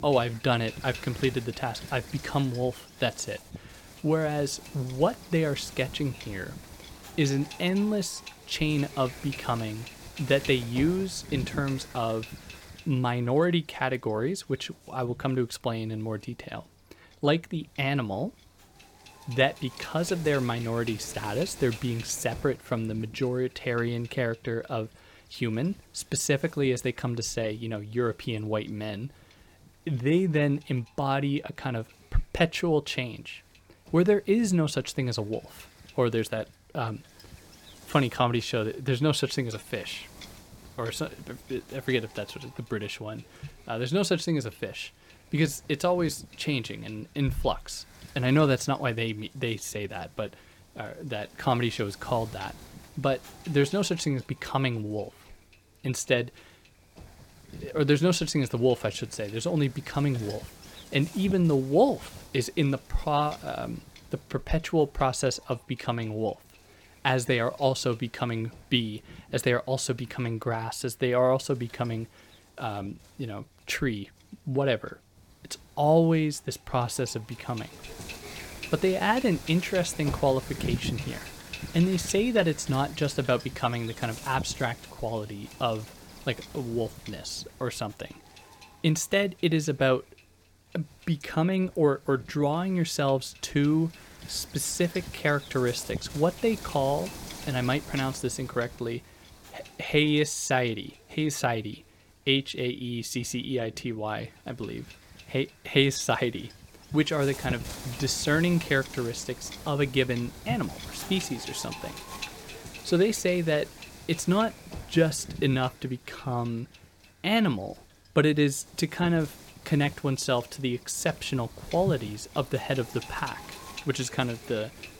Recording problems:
wind noise on the microphone; occasional gusts; 15 dB below the speech

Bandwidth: 17 kHz